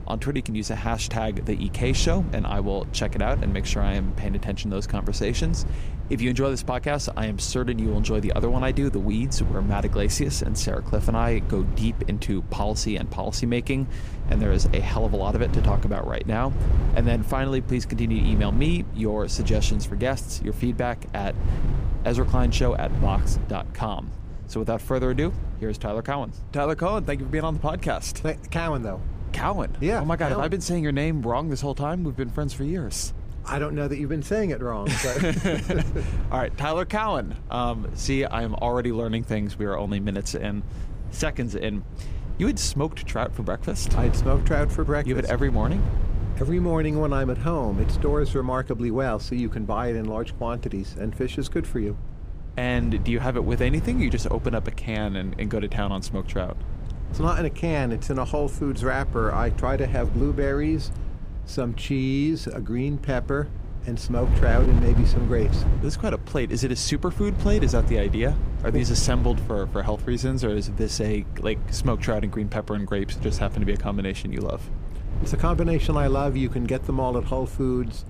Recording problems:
wind noise on the microphone; occasional gusts; 15 dB below the speech

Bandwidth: 15 kHz